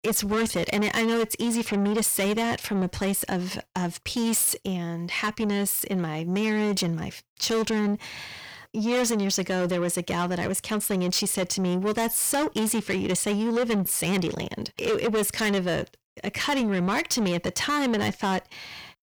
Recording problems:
distortion; heavy; 7 dB below the speech

